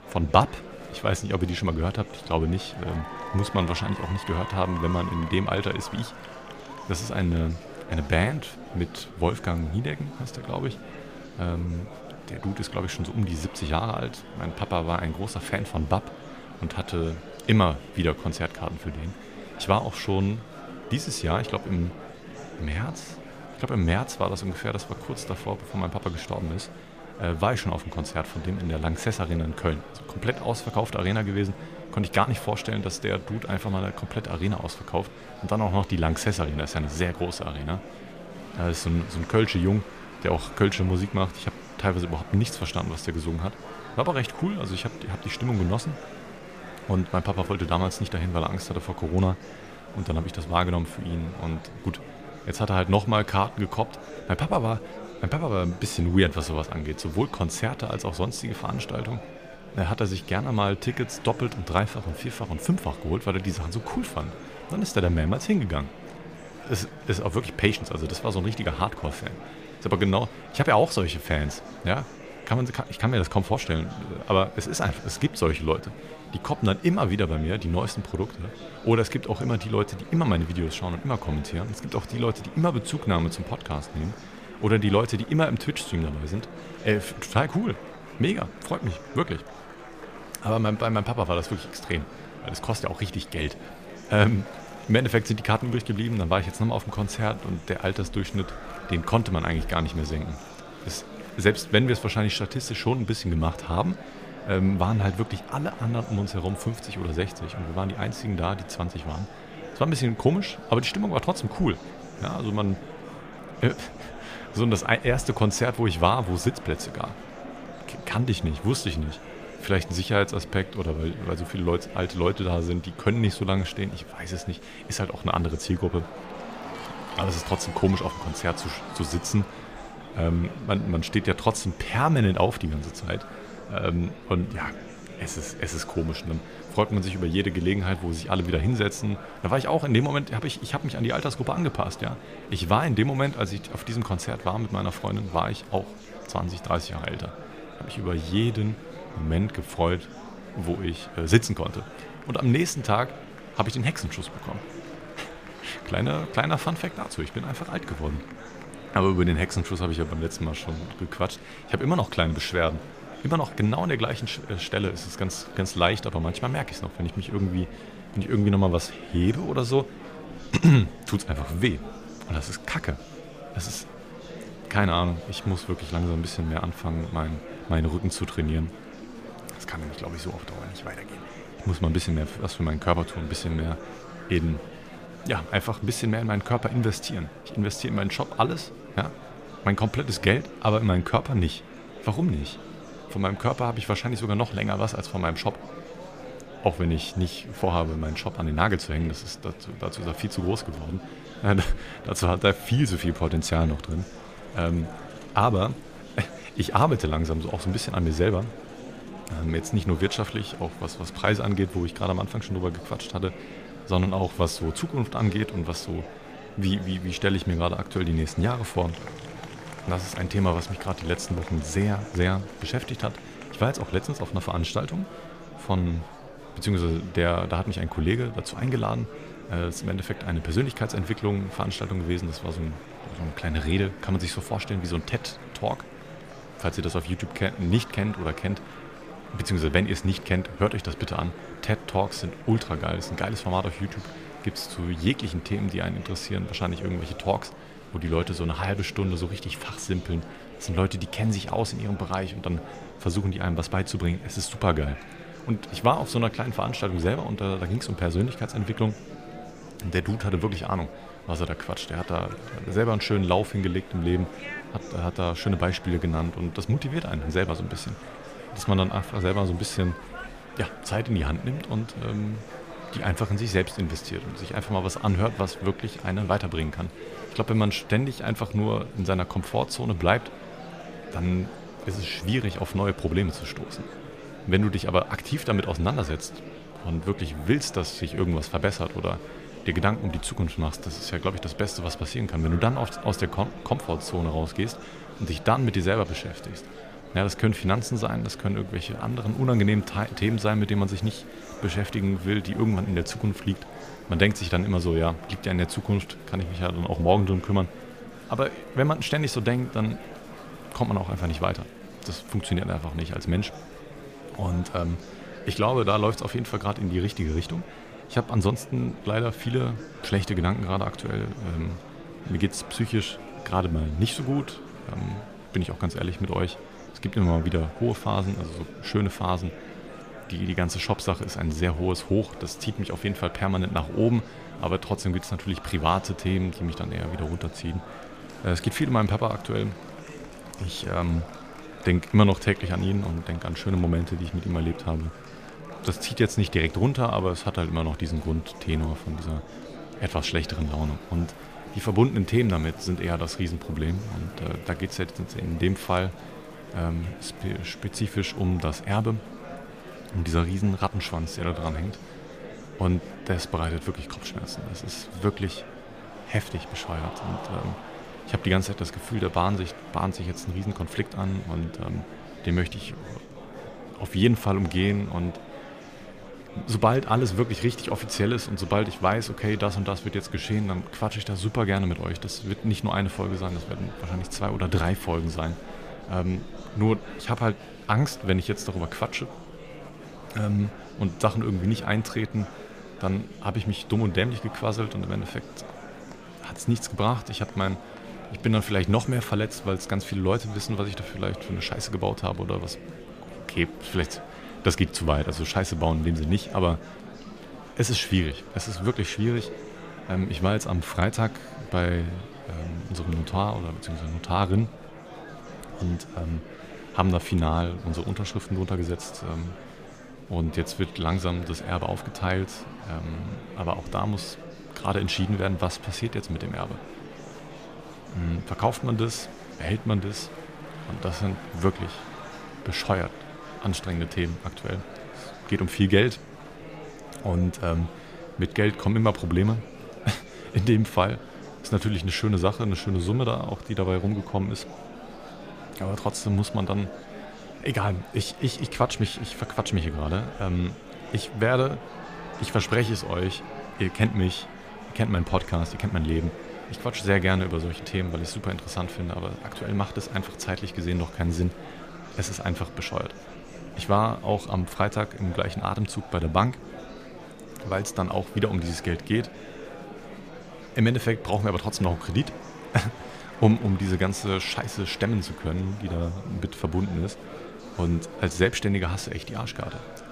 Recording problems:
murmuring crowd; noticeable; throughout; 15 dB below the speech

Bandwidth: 15 kHz